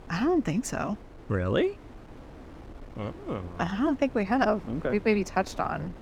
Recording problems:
wind noise on the microphone; occasional gusts; 20 dB below the speech

